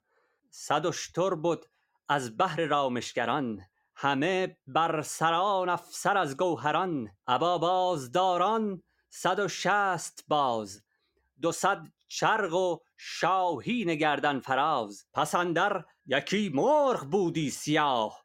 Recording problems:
none

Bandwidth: 16.5 kHz